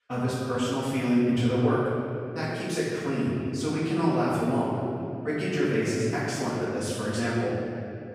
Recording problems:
room echo; strong; dies away in 2.6 s
off-mic speech; far

